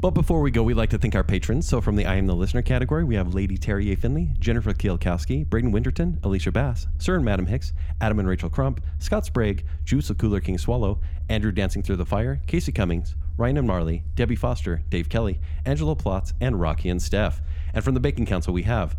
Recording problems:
low rumble; faint; throughout; 20 dB below the speech

